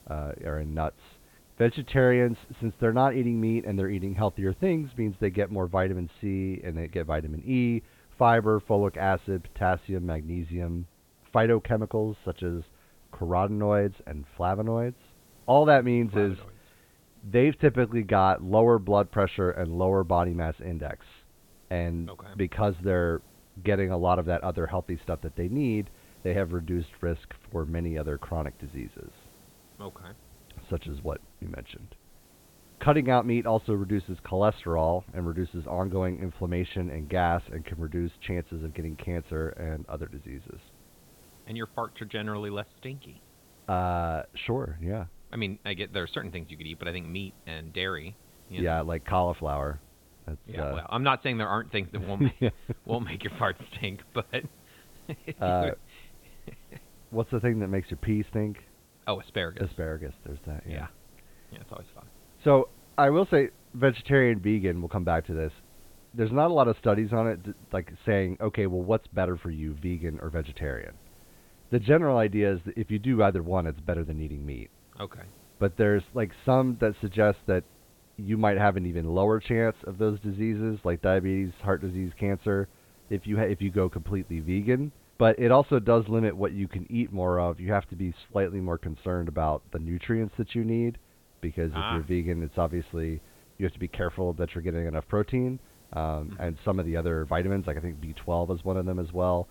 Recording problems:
high frequencies cut off; severe; nothing above 4 kHz
hiss; faint; throughout; 30 dB below the speech

